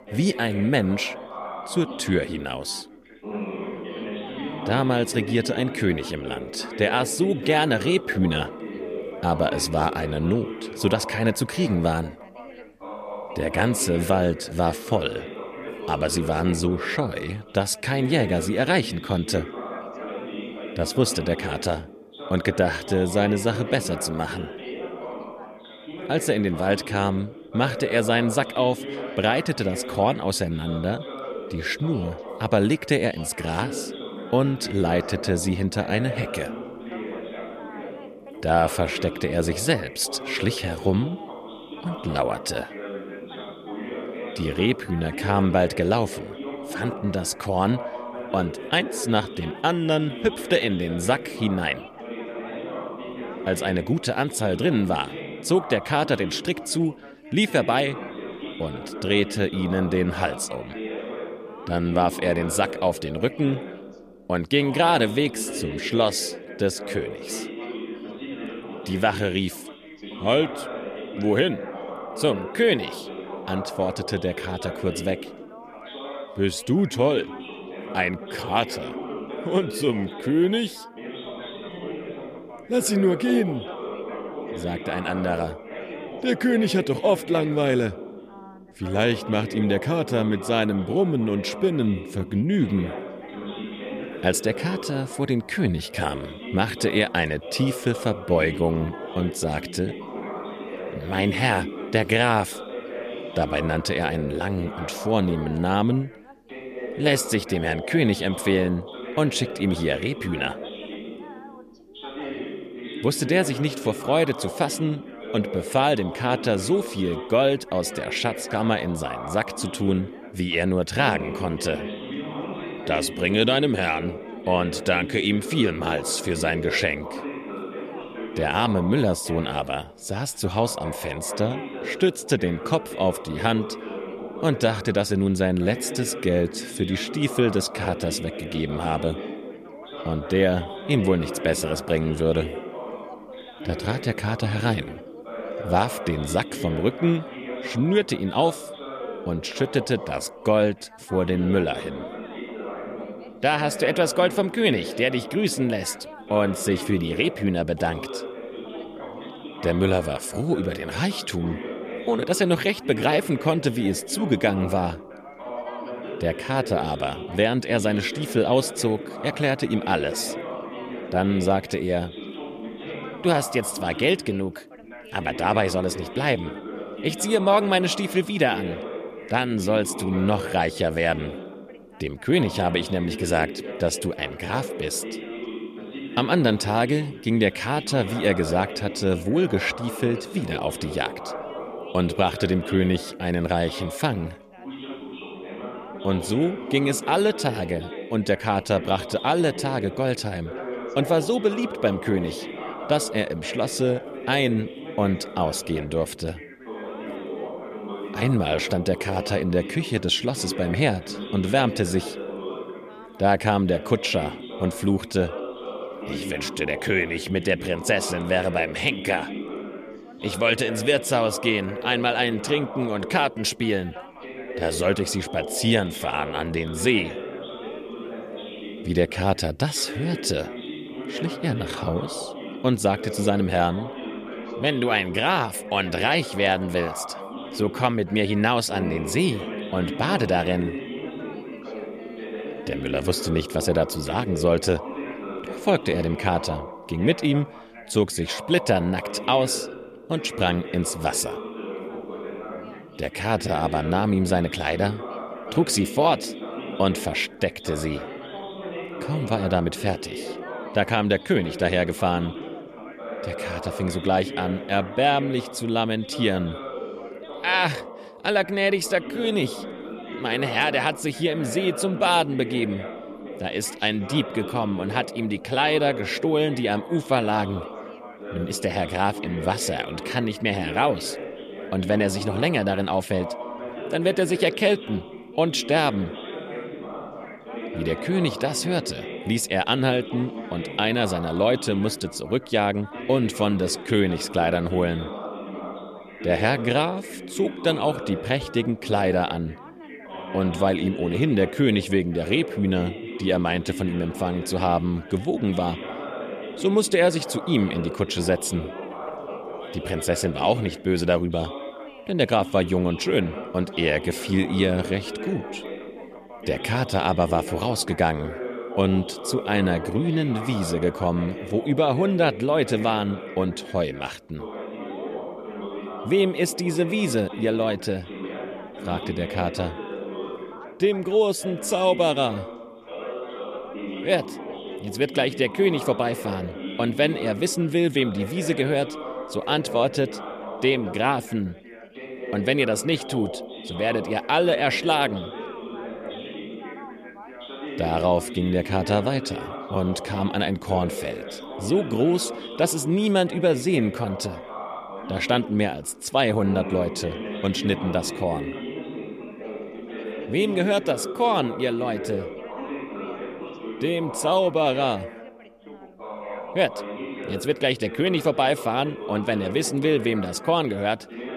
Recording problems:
background chatter; noticeable; throughout; 3 voices, 10 dB below the speech

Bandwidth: 14.5 kHz